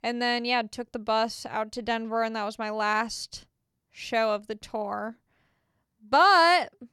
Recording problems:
none

